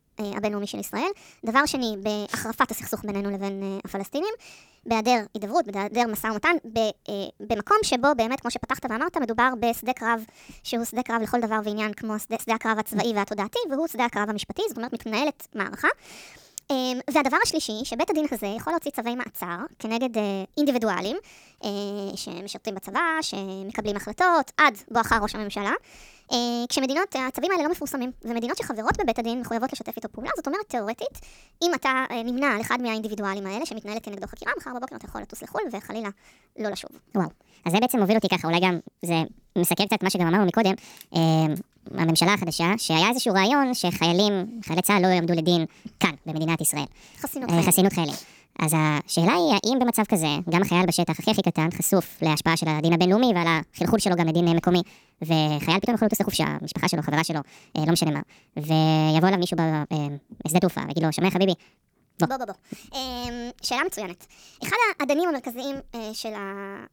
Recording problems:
wrong speed and pitch; too fast and too high; 1.5 times normal speed

